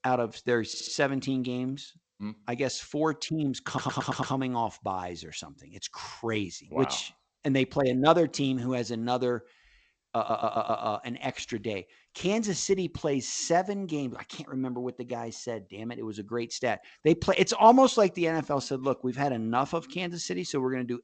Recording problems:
garbled, watery; slightly; nothing above 7.5 kHz
audio stuttering; at 0.5 s, at 3.5 s and at 10 s

